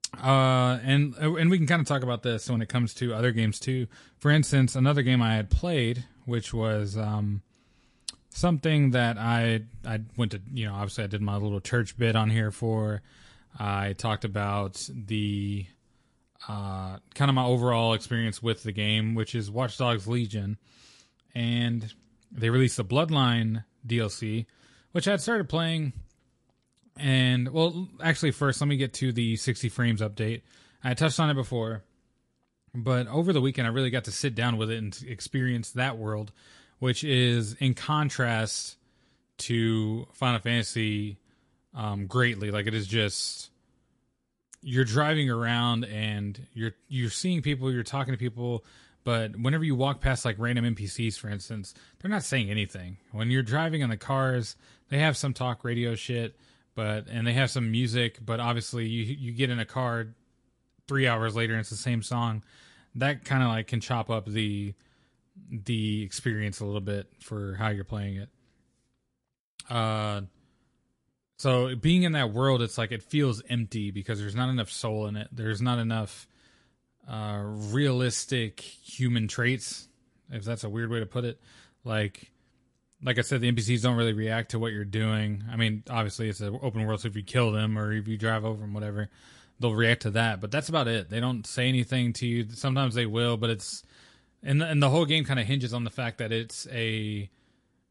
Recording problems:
garbled, watery; slightly; nothing above 11 kHz

